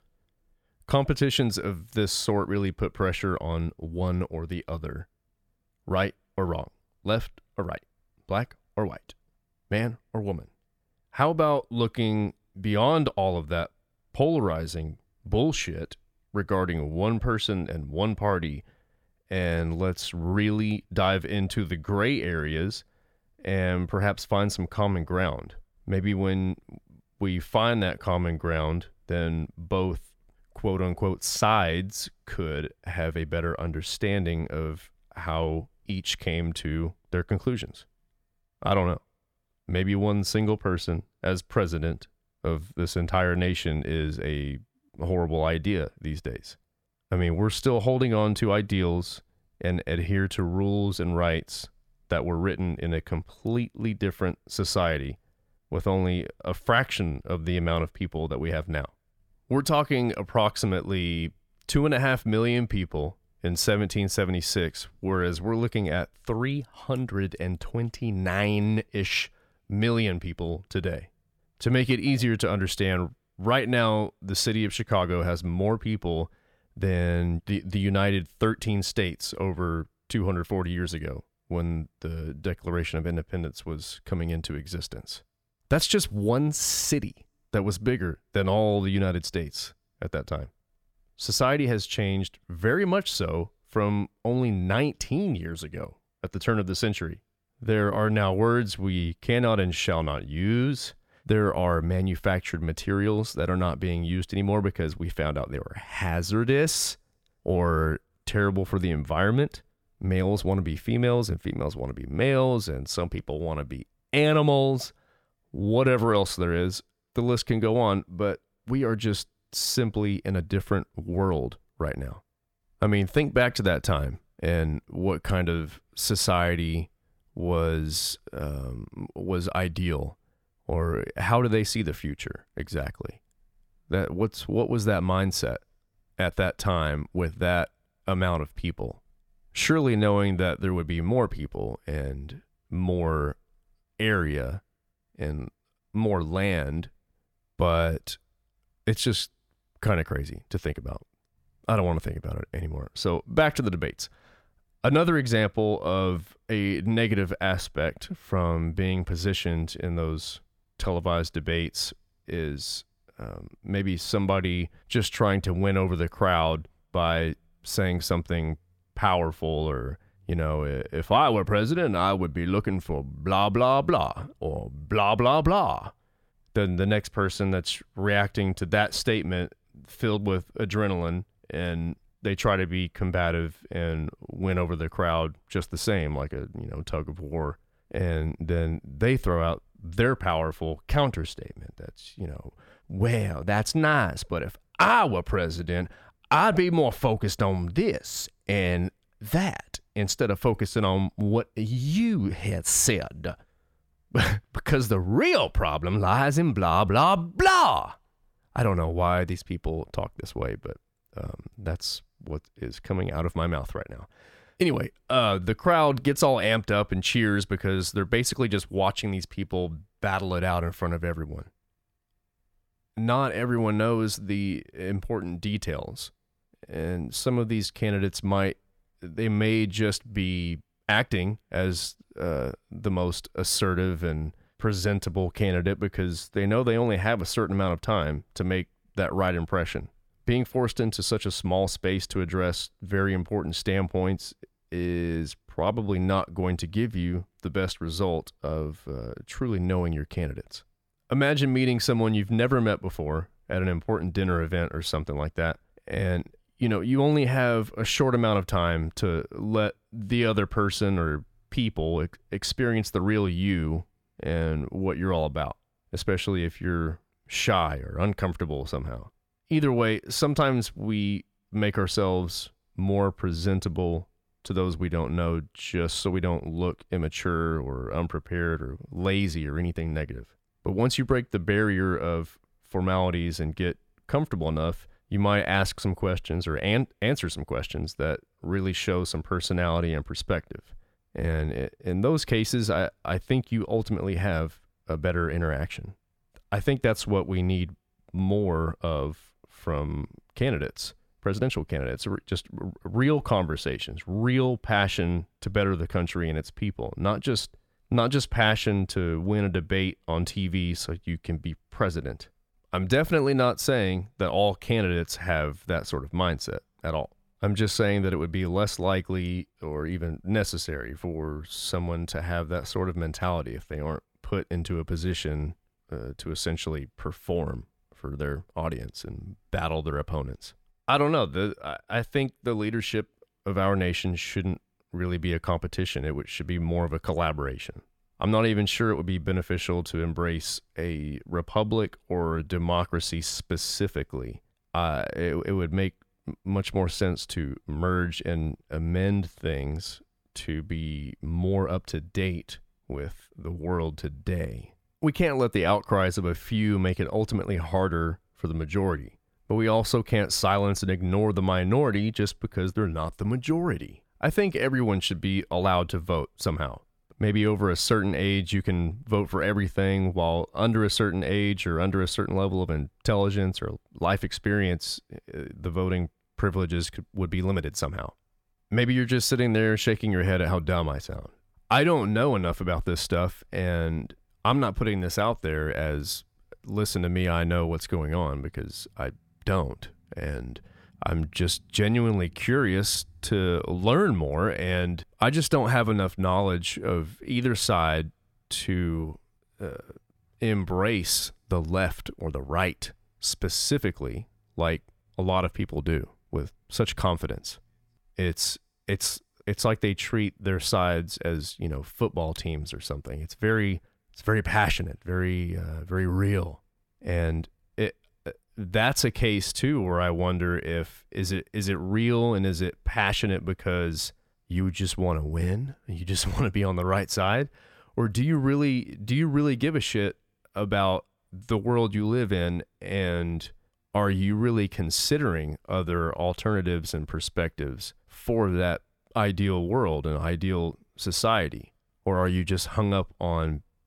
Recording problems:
none

